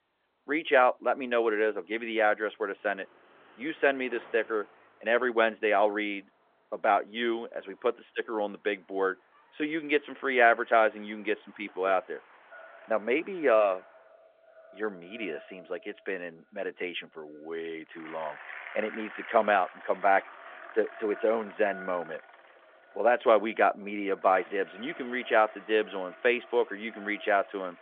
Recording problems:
echo of what is said; faint; from 13 s on; 500 ms later, 25 dB below the speech
phone-call audio; nothing above 3.5 kHz
traffic noise; faint; throughout; 20 dB below the speech

